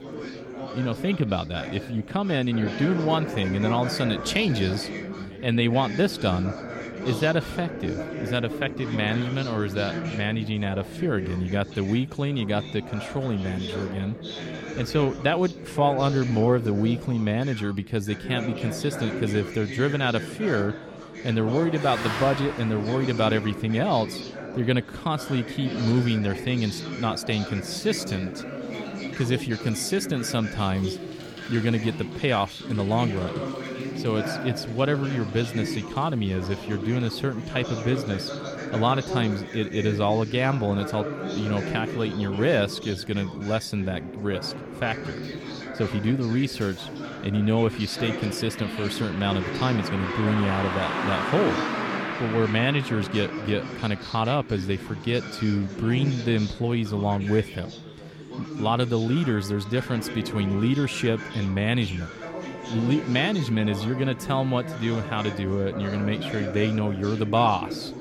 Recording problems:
chatter from many people; loud; throughout; 8 dB below the speech
traffic noise; noticeable; throughout; 10 dB below the speech

